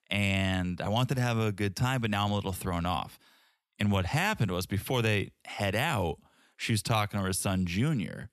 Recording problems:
none

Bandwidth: 13.5 kHz